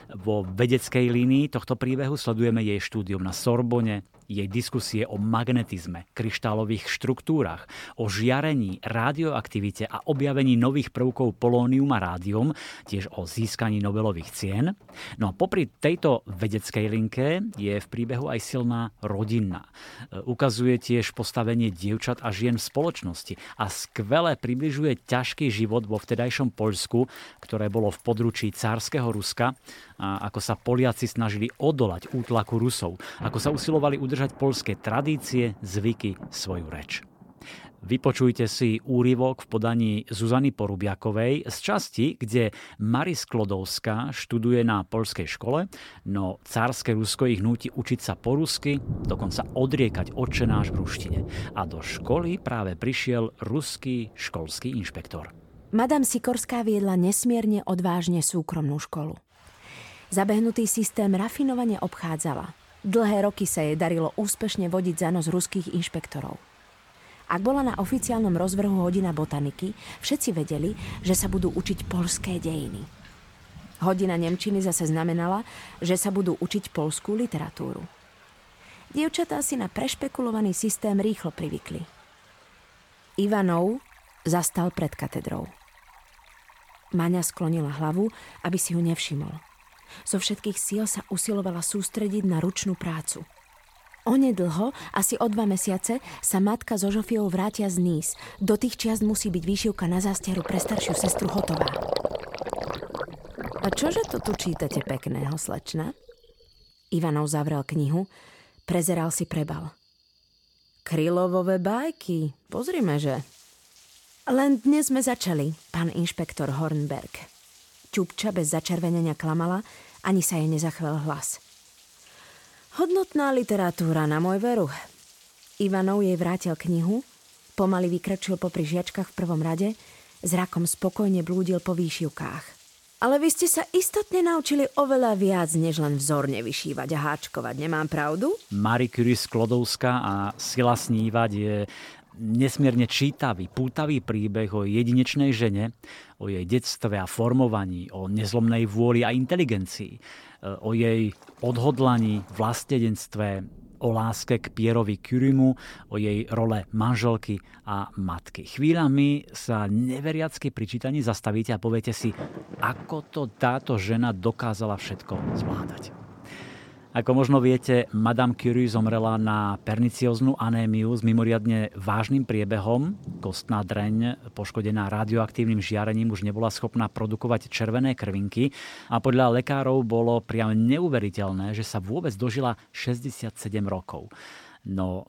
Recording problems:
rain or running water; noticeable; throughout; 15 dB below the speech

